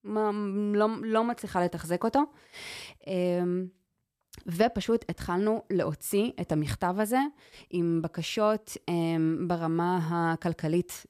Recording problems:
none

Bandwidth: 14.5 kHz